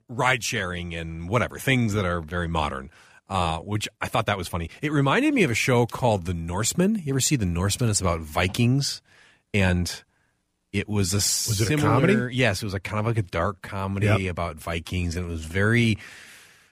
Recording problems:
uneven, jittery; strongly; from 1 to 16 s

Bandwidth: 15 kHz